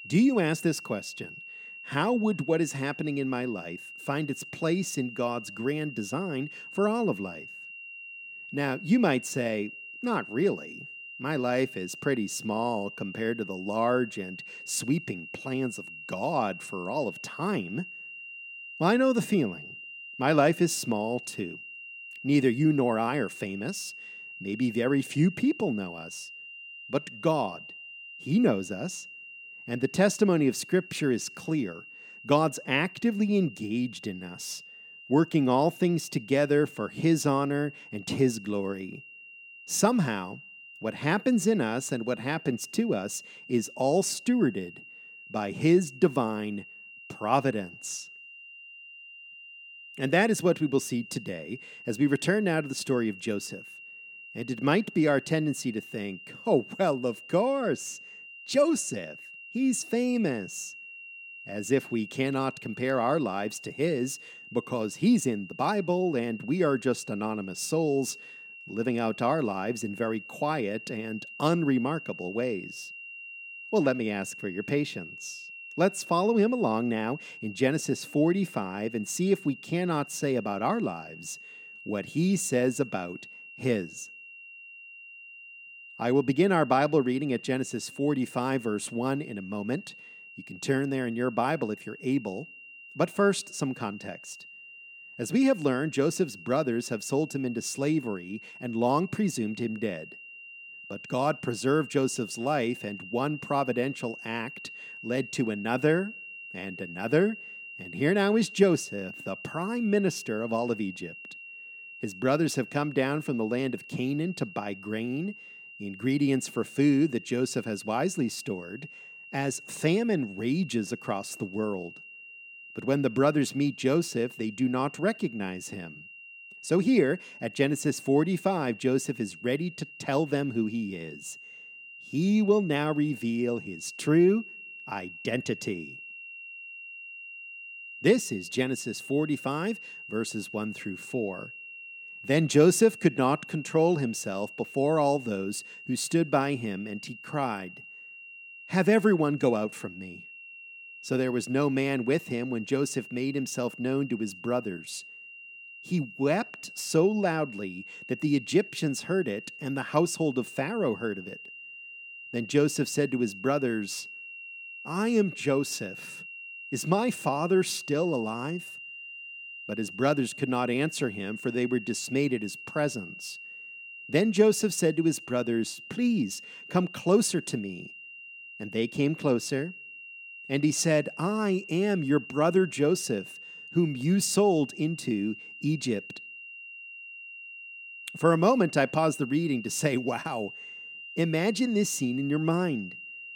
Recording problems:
high-pitched whine; noticeable; throughout; 3 kHz, 15 dB below the speech

